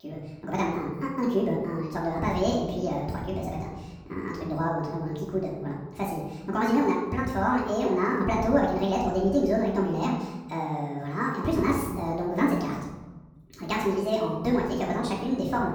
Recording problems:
off-mic speech; far
wrong speed and pitch; too fast and too high; 1.6 times normal speed
room echo; noticeable; dies away in 1.1 s

